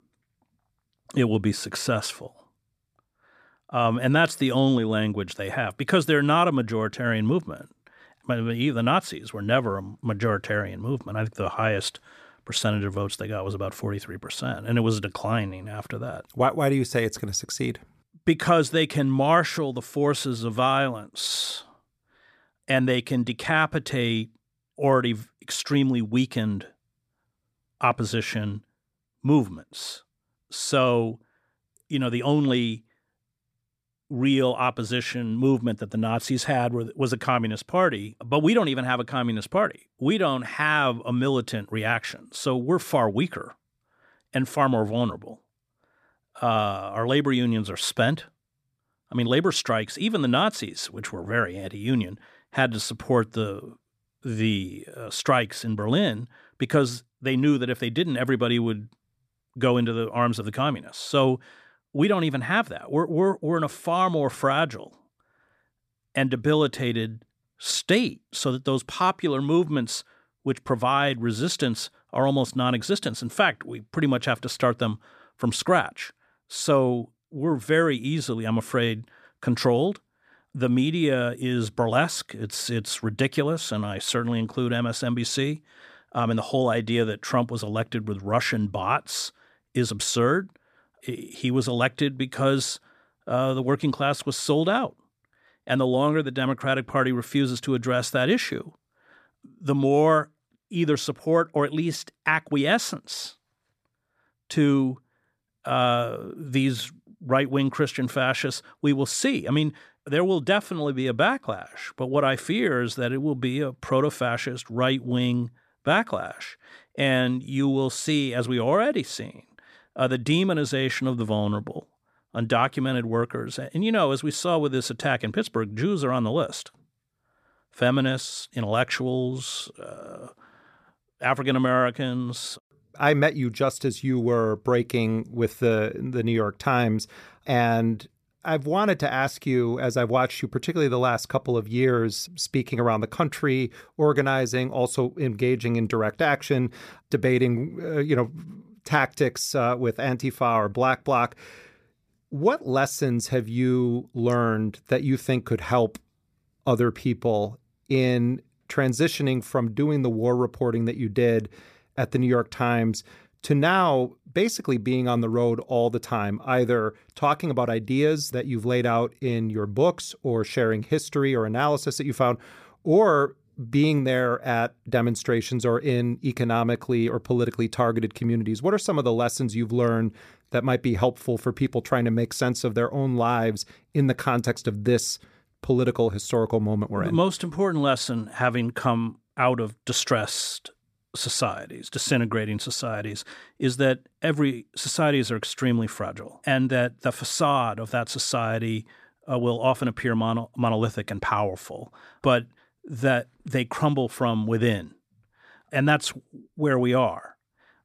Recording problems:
none

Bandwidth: 14.5 kHz